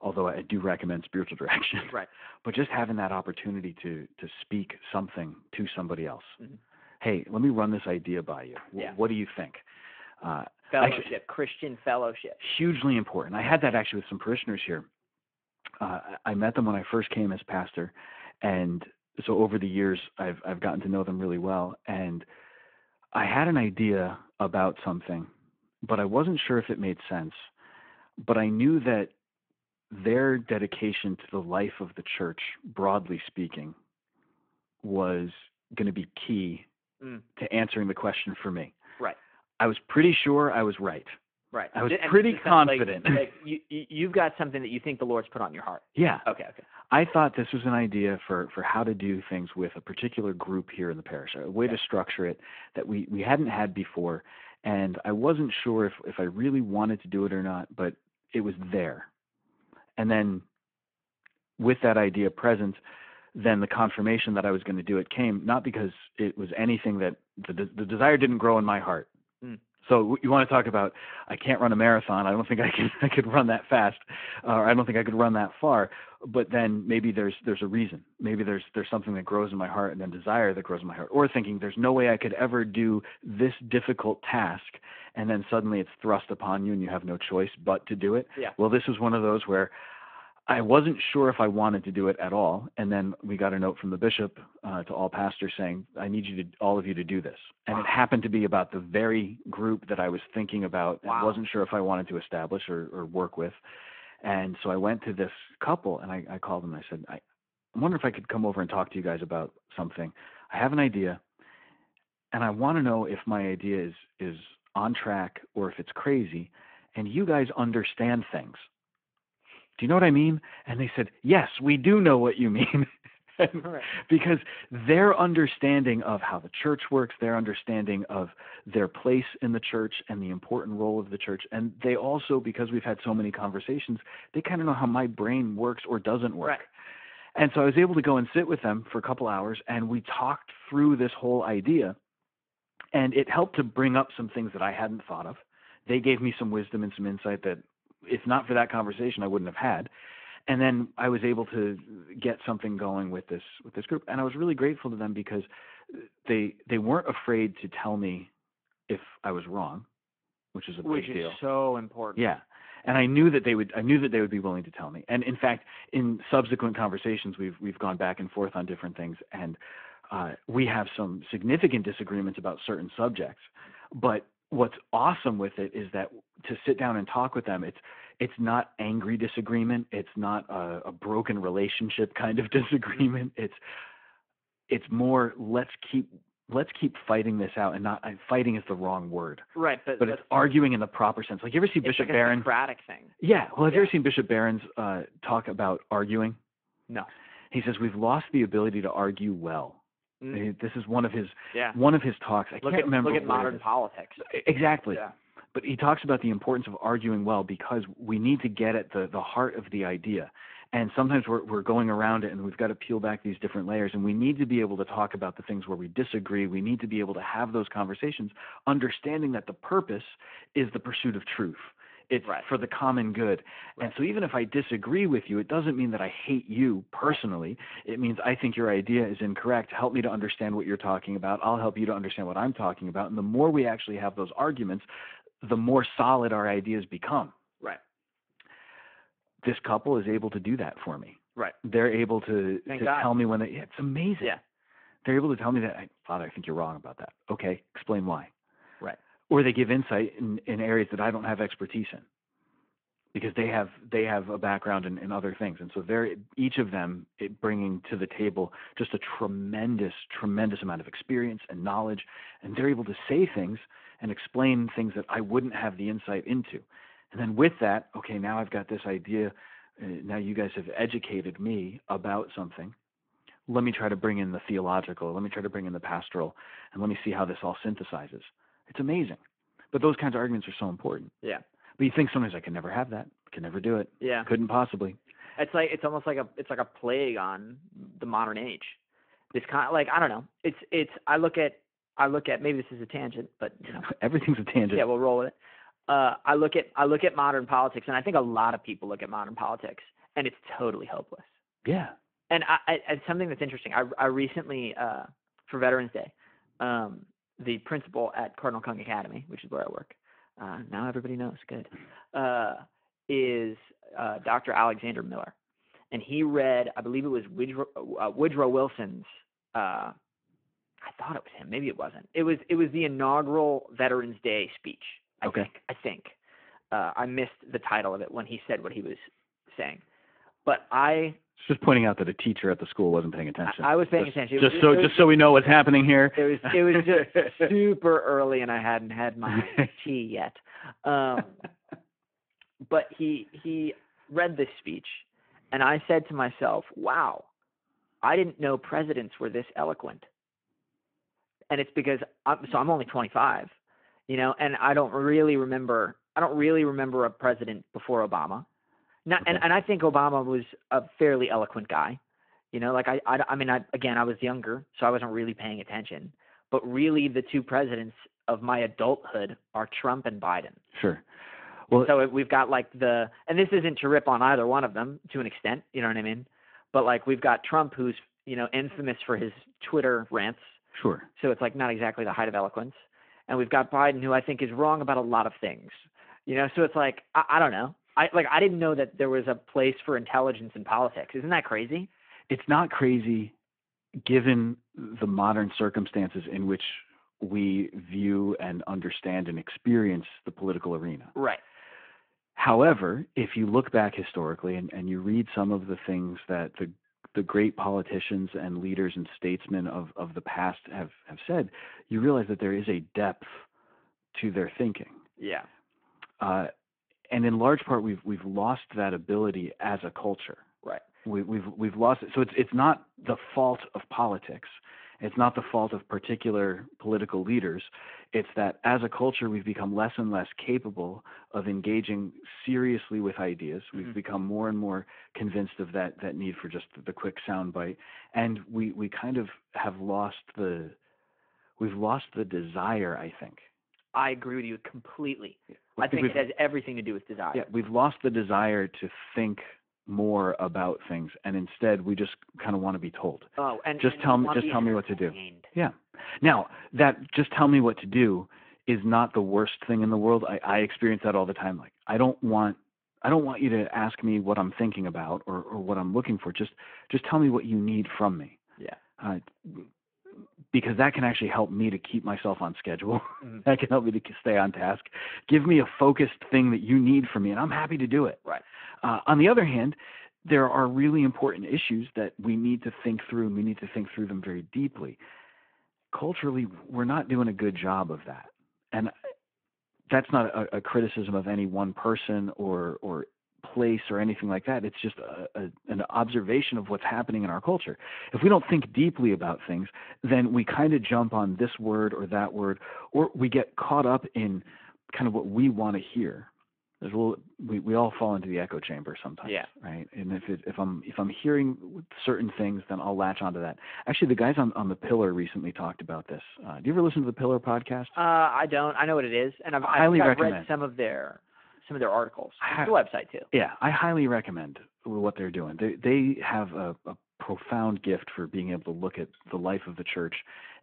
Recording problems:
phone-call audio

